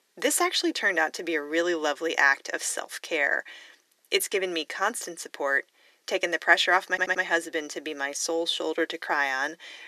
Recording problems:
thin; very; fading below 400 Hz
audio stuttering; at 7 s

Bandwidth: 14 kHz